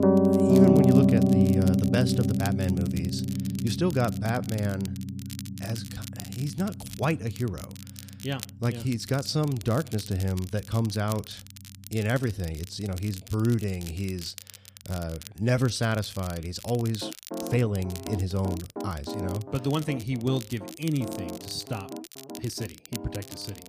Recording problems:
background music; very loud; throughout; 3 dB above the speech
crackle, like an old record; noticeable; 15 dB below the speech
uneven, jittery; strongly; from 3.5 to 23 s

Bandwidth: 15 kHz